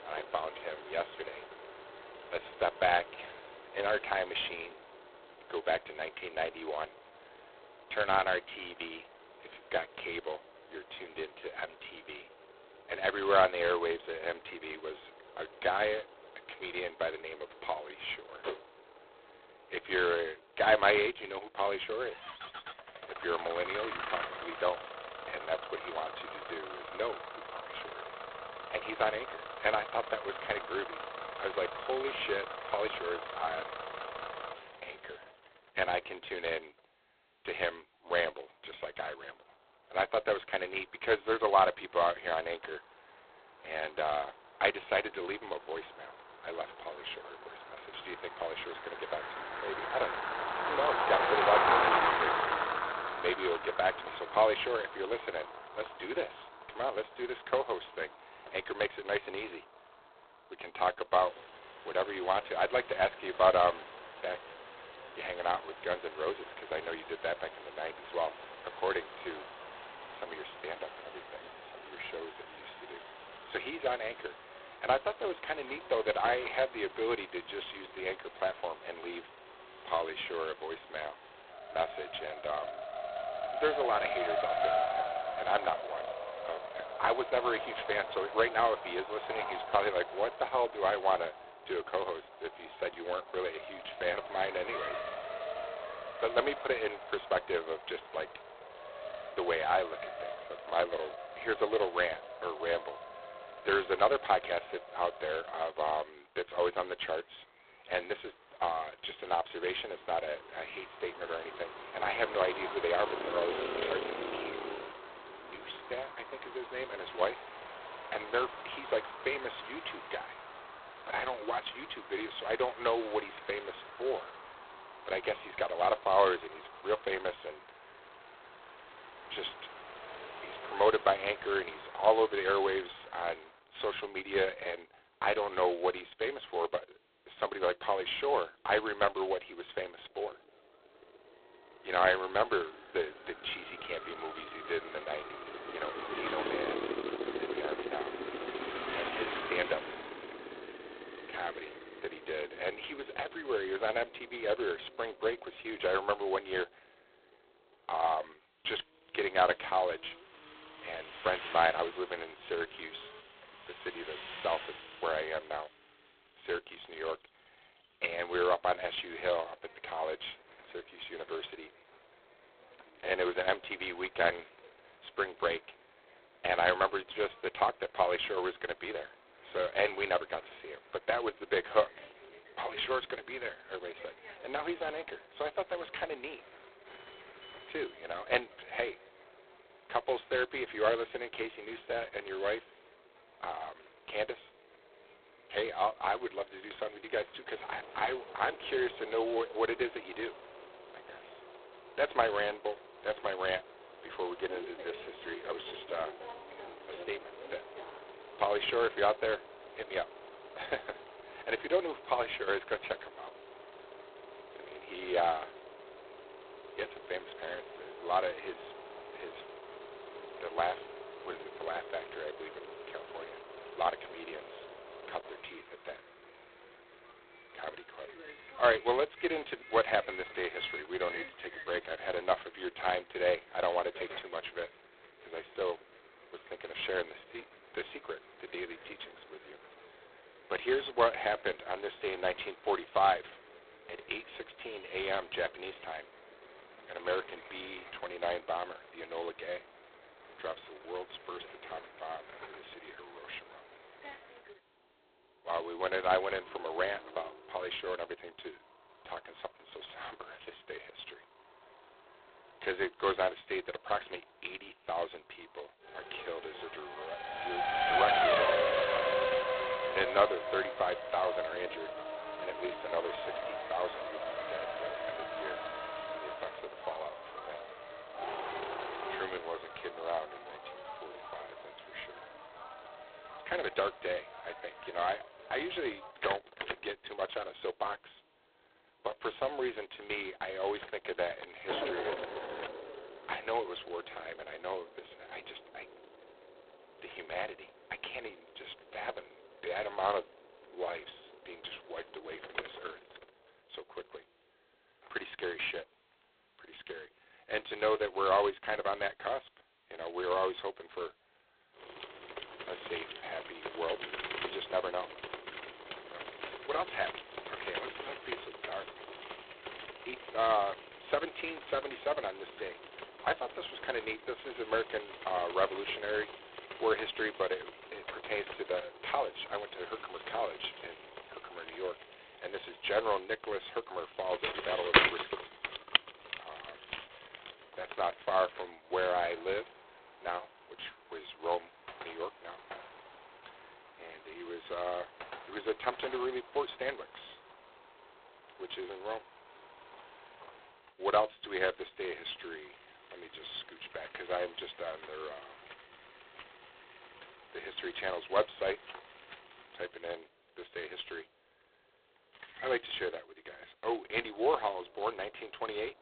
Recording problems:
phone-call audio; poor line; nothing above 4 kHz
traffic noise; loud; throughout; 6 dB below the speech

